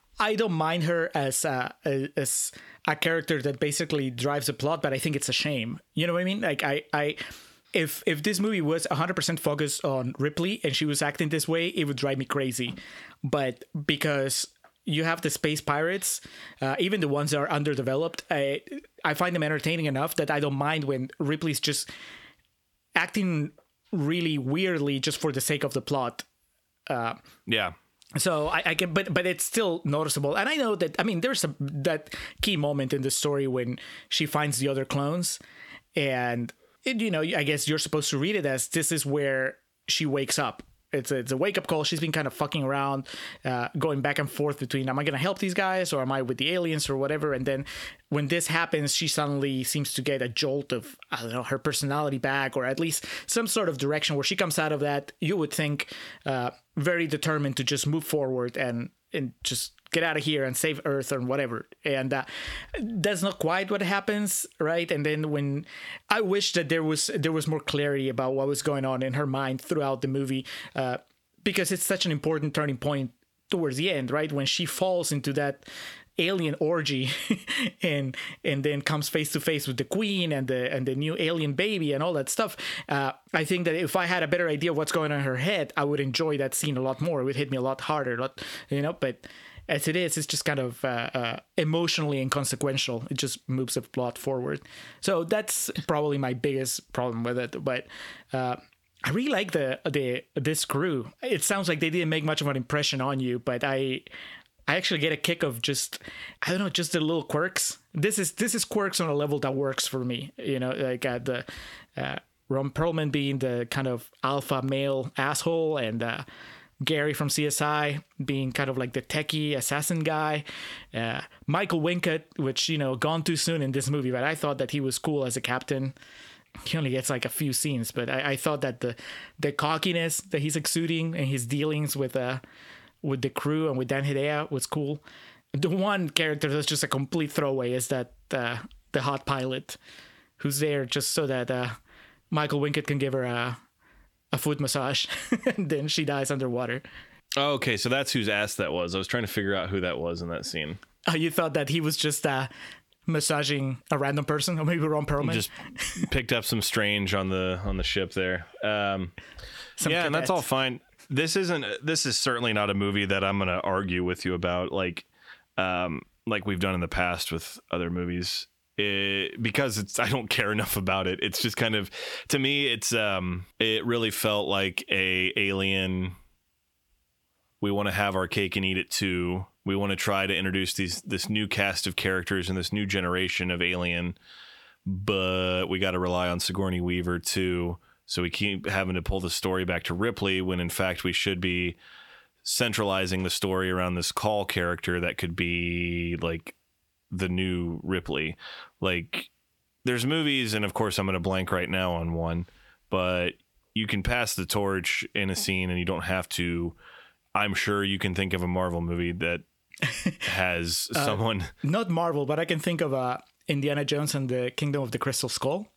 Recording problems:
squashed, flat; heavily

